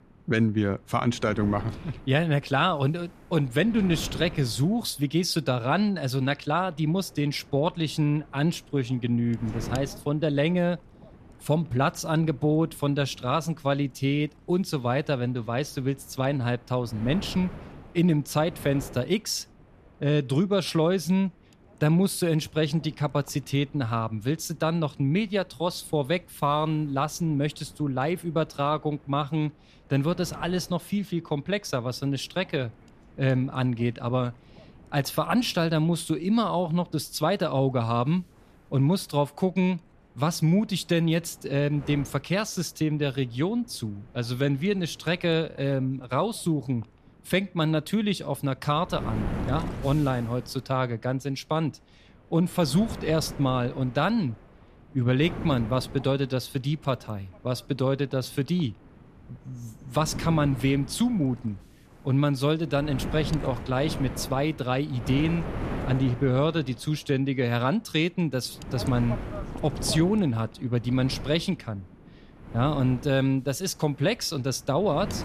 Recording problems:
wind noise on the microphone; occasional gusts; 15 dB below the speech

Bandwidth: 14.5 kHz